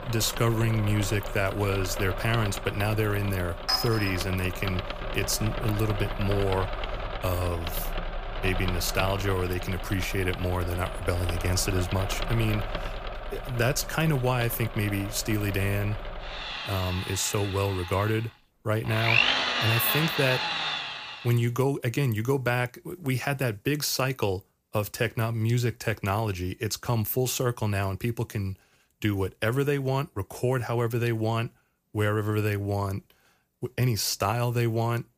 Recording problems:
machinery noise; loud; until 21 s; 4 dB below the speech
clattering dishes; loud; at 3.5 s; peak 1 dB above the speech

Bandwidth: 15 kHz